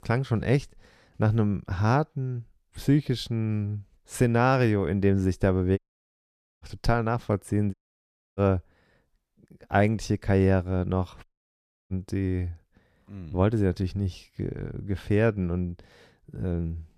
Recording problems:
audio cutting out; at 6 s for 1 s, at 7.5 s for 0.5 s and at 11 s for 0.5 s

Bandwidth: 14.5 kHz